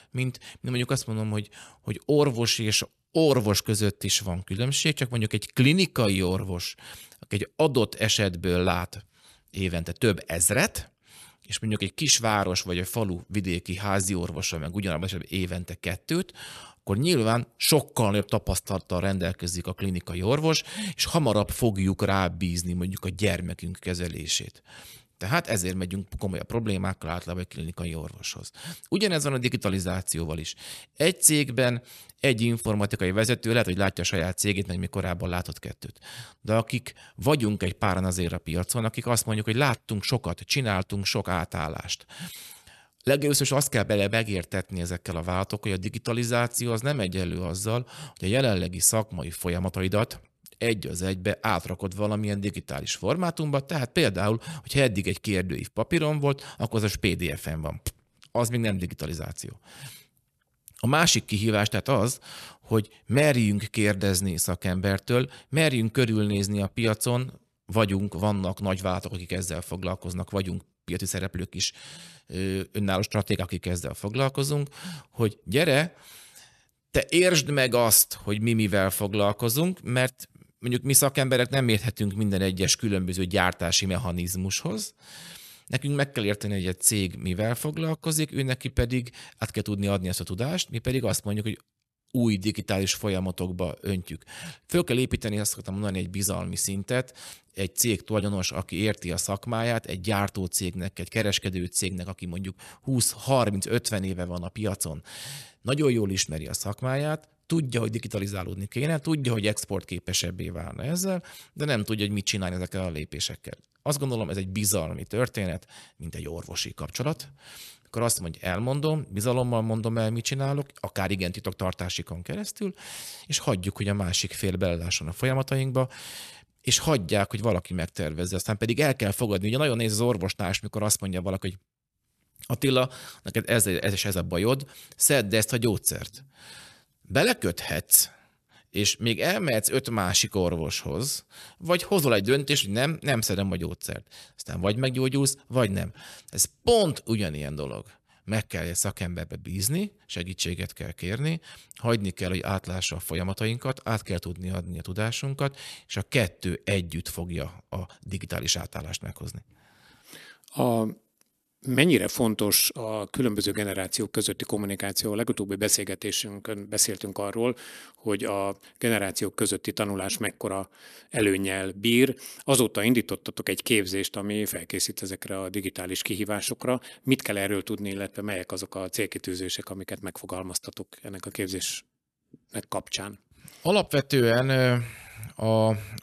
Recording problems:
none

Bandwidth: 13.5 kHz